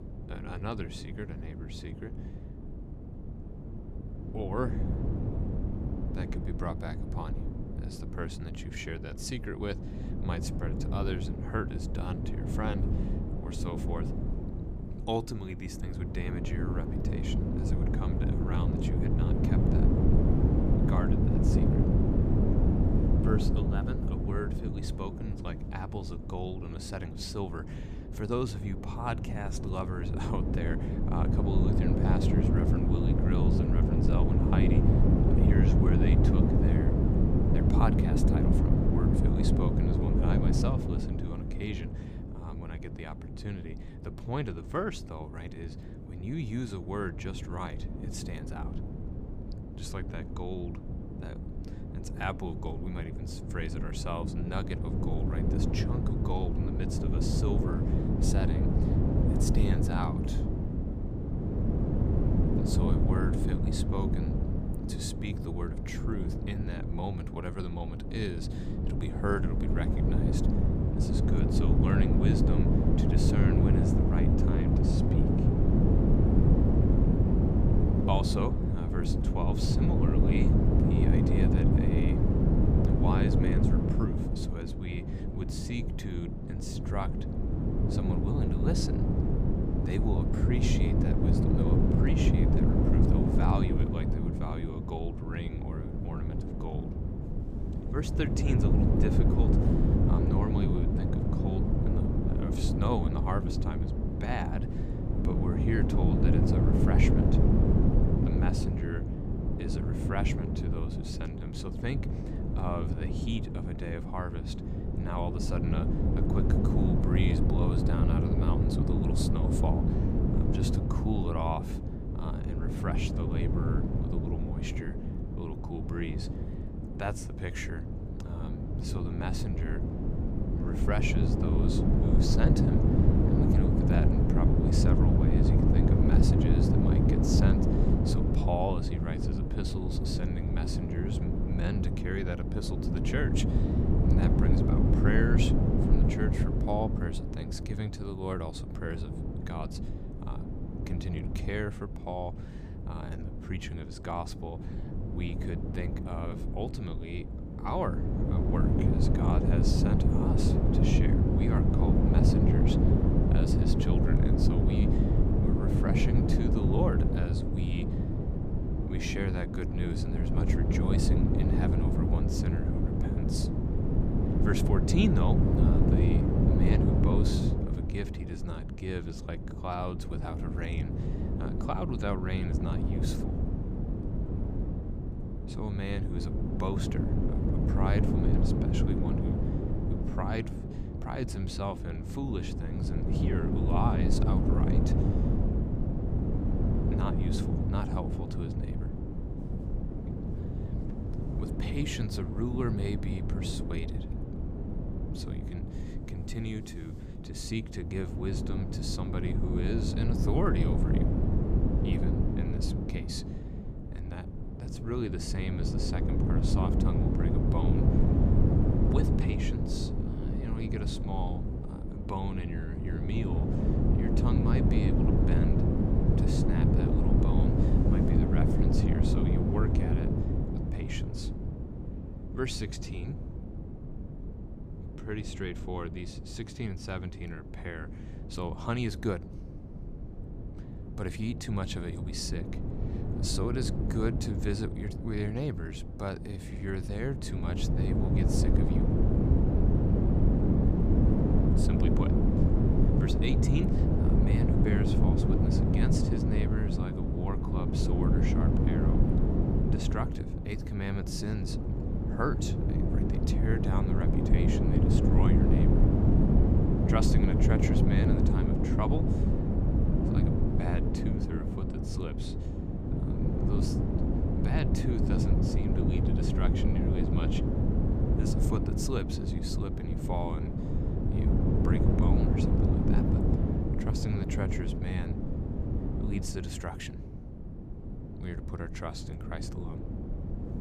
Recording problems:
wind noise on the microphone; heavy; 3 dB above the speech

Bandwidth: 15 kHz